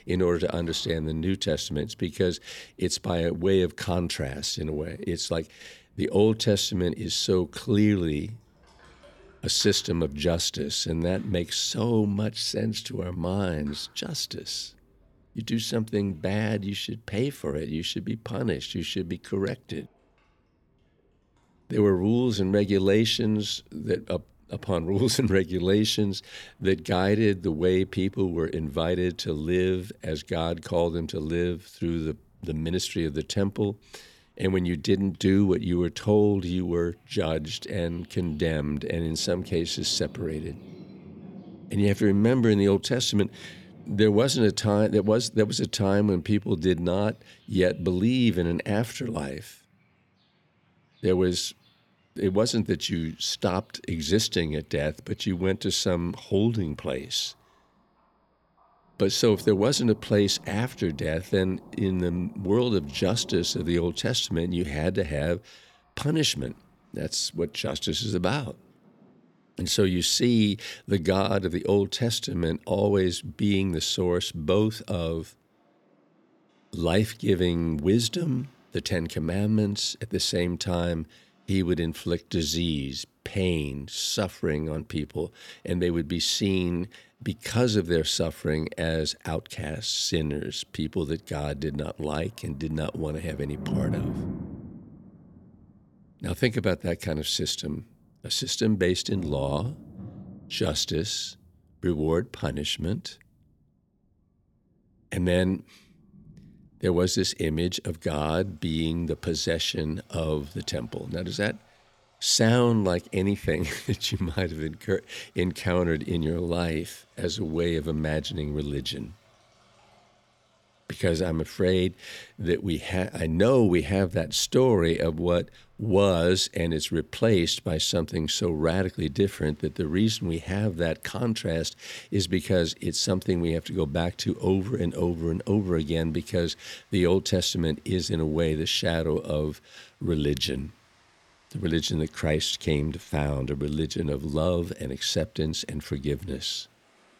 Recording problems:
rain or running water; noticeable; throughout; 20 dB below the speech

